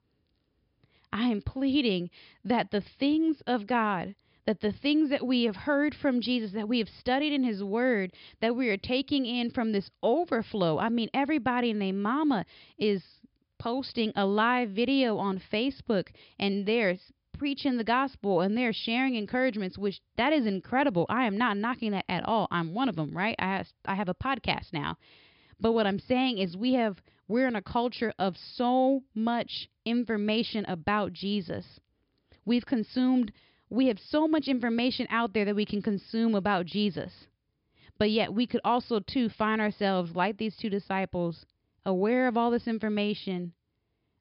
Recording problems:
high frequencies cut off; noticeable; nothing above 5 kHz

